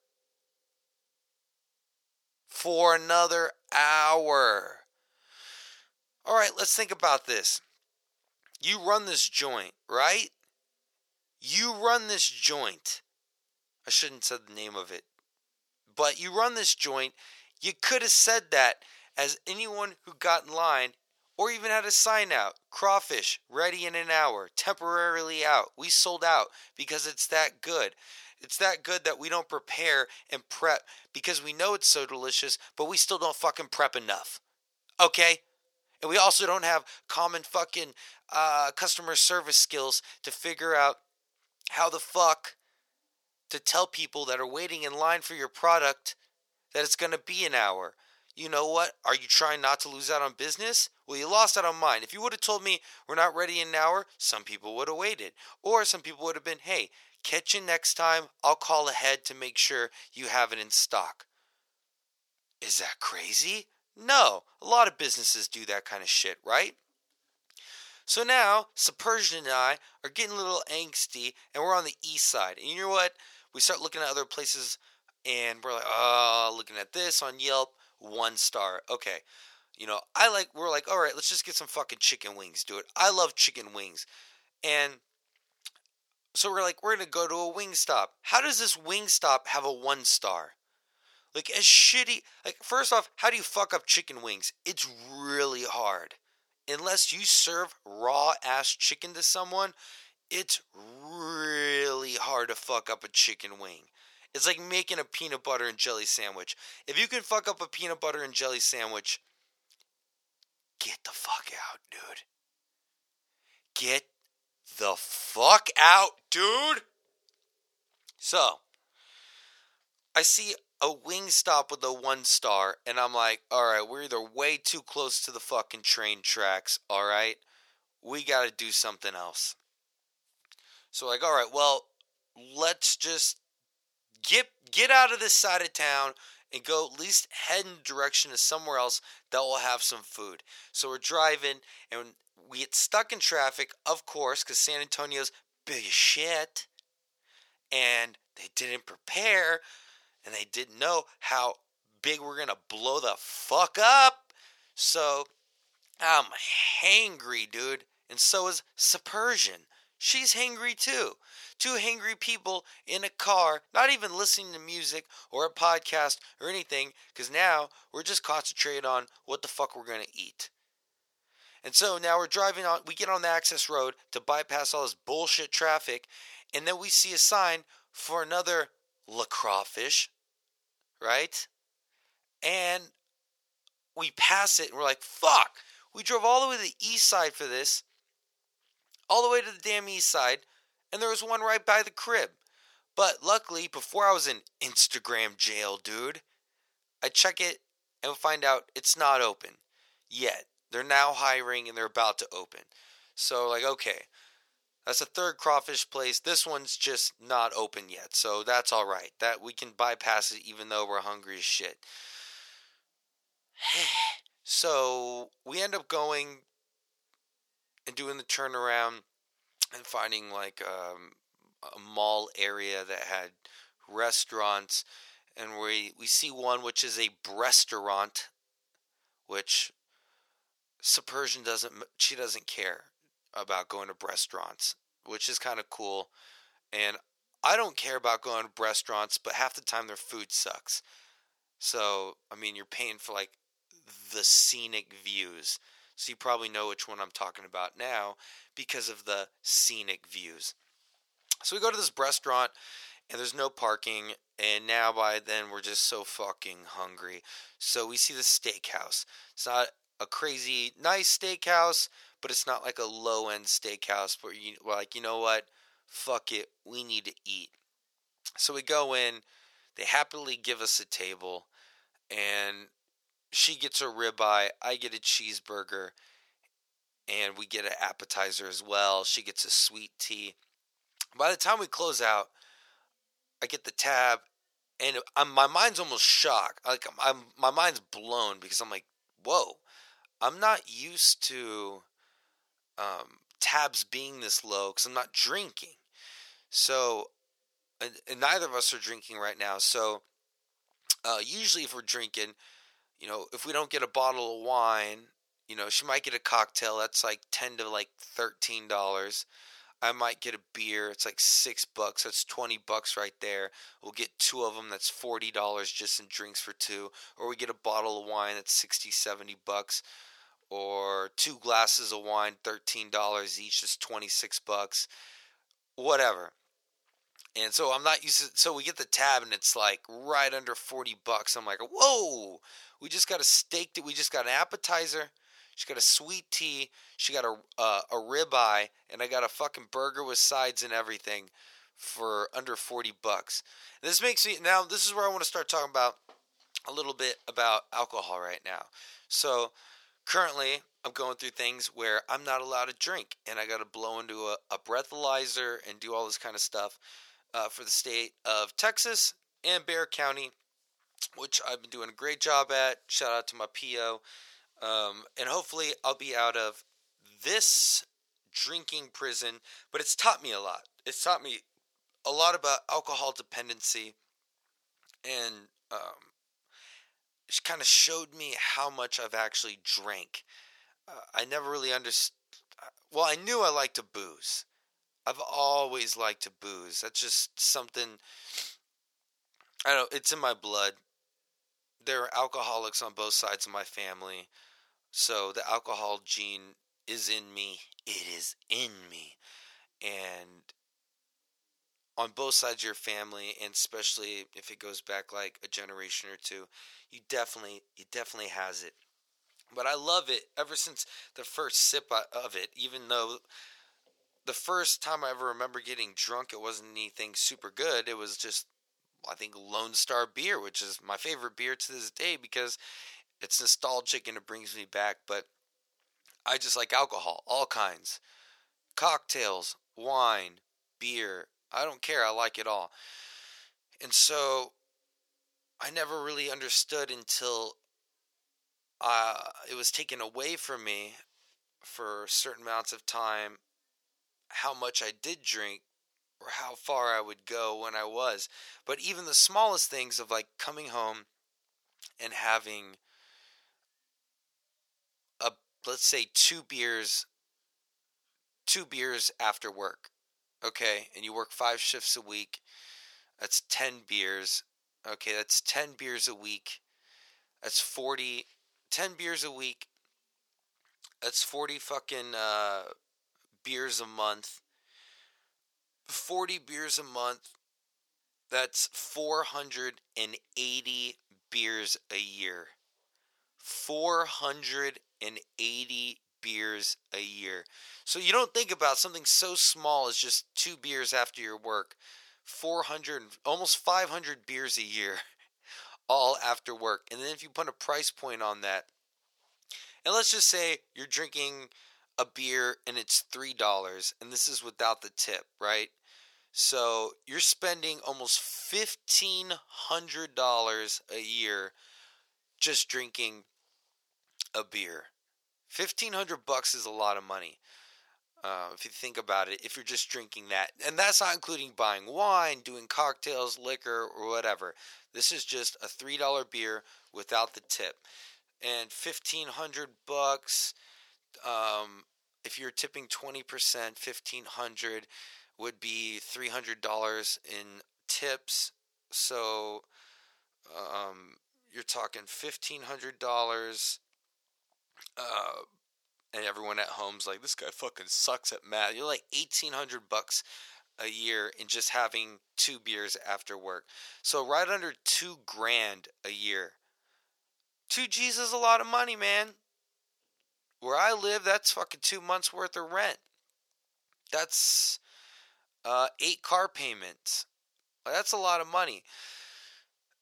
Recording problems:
thin; very; fading below 750 Hz

